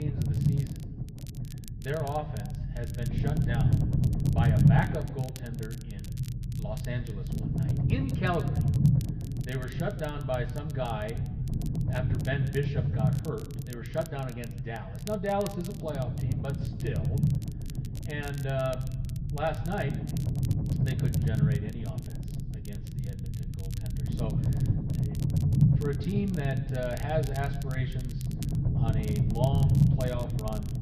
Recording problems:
muffled; slightly; fading above 2.5 kHz
room echo; very slight; dies away in 0.8 s
off-mic speech; somewhat distant
low rumble; loud; throughout; 5 dB below the speech
crackle, like an old record; noticeable; 15 dB below the speech
abrupt cut into speech; at the start

